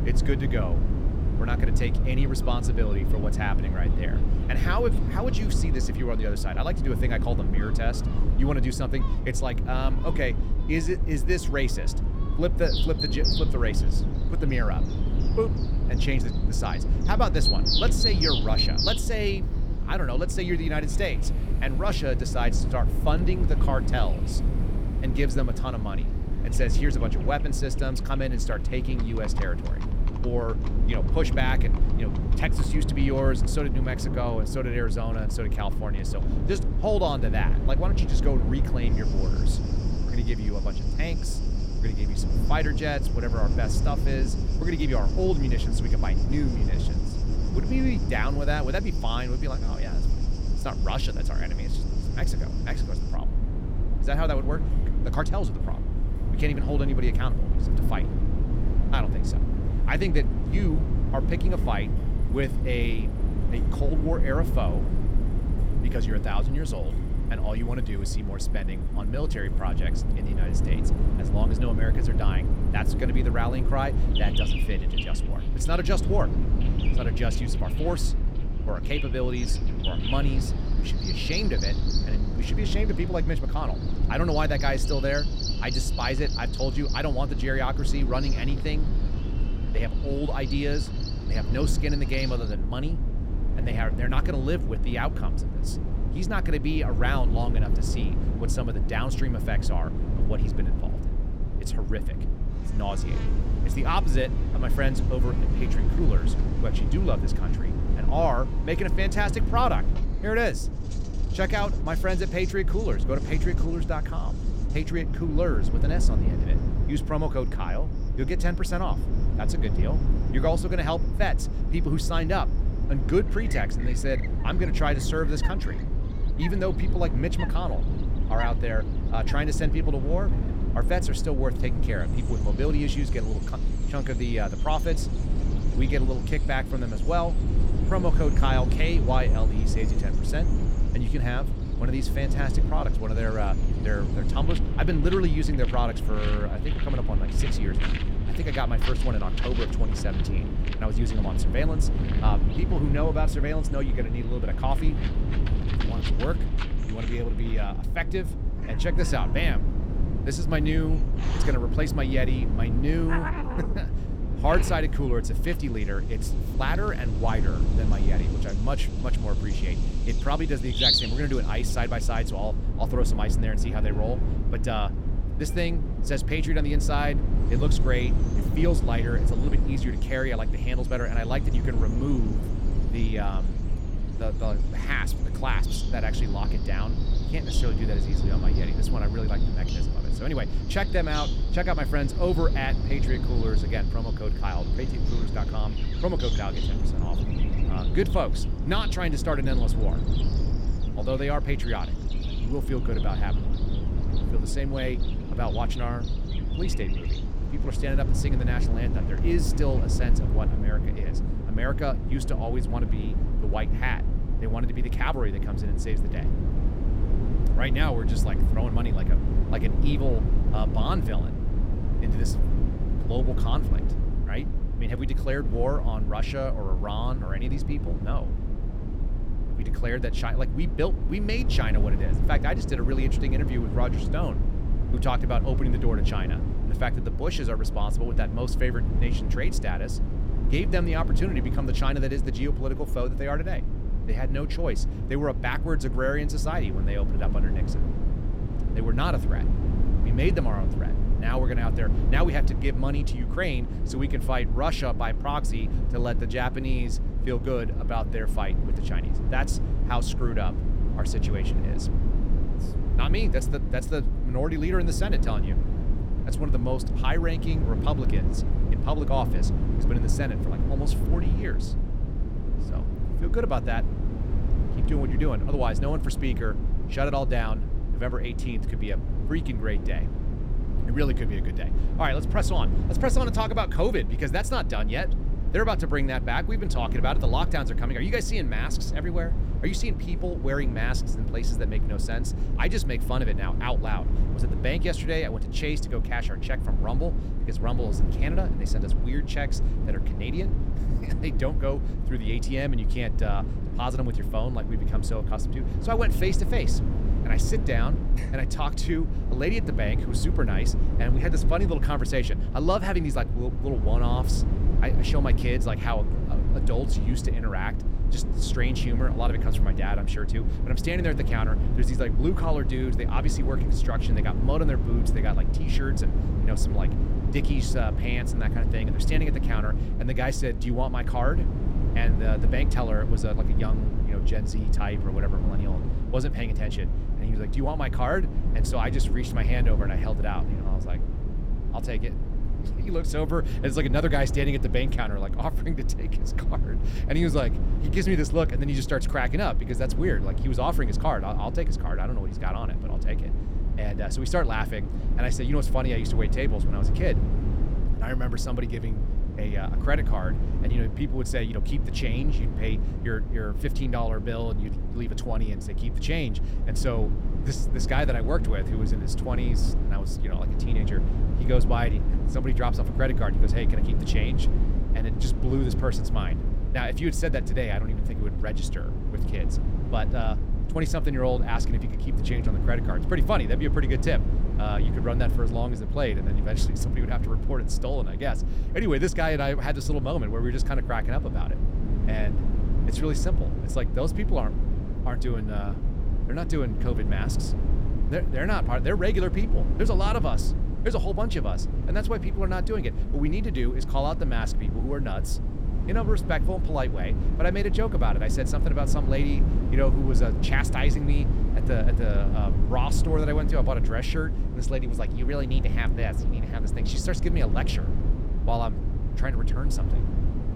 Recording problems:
animal sounds; loud; until 3:30; 6 dB below the speech
low rumble; loud; throughout; 8 dB below the speech
rain or running water; noticeable; throughout; 20 dB below the speech

